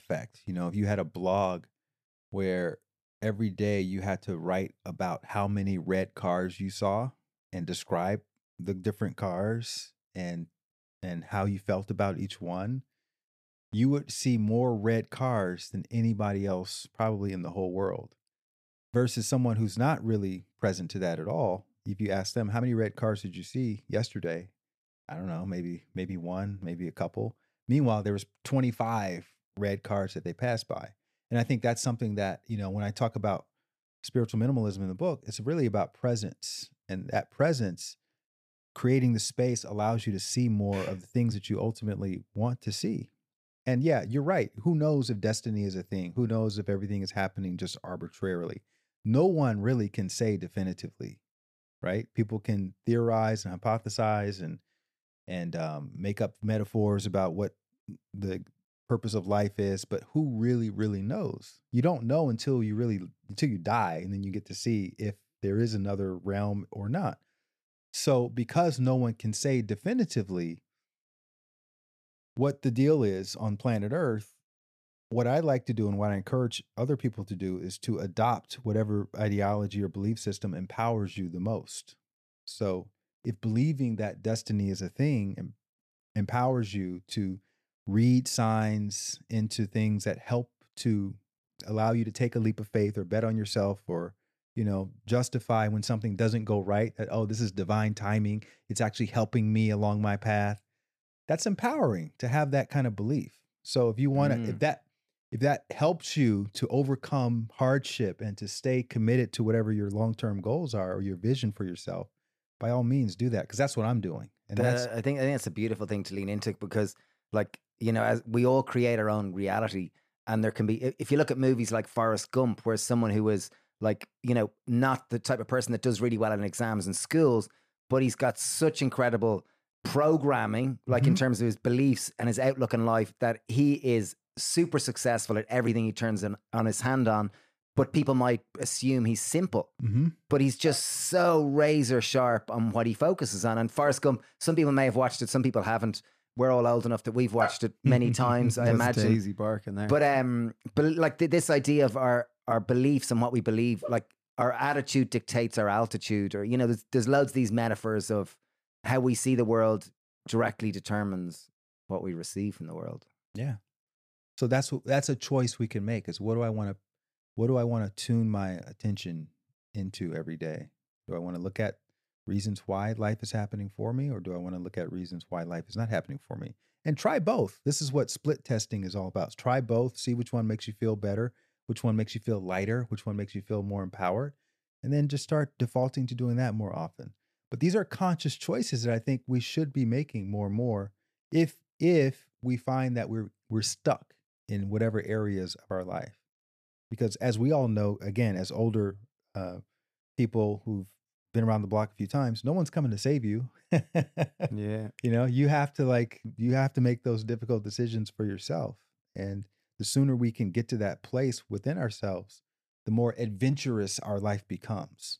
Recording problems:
none

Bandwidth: 14.5 kHz